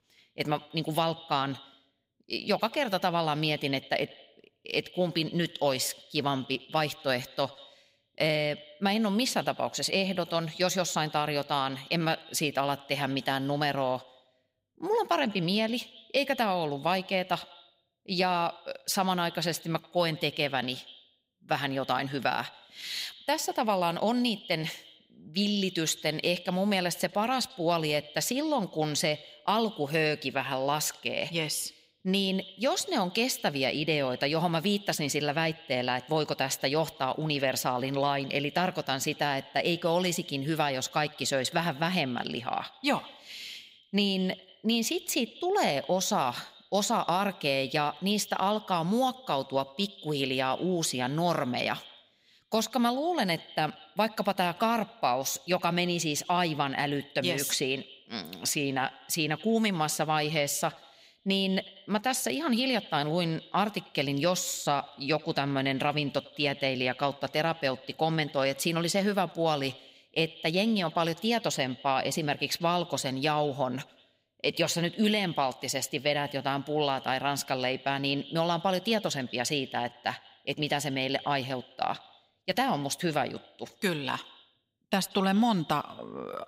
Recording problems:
echo of what is said; faint; throughout; 90 ms later, 20 dB below the speech

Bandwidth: 15.5 kHz